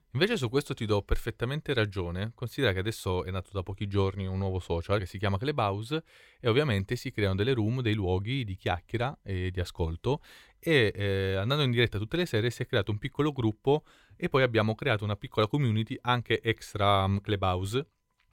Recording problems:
none

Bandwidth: 16.5 kHz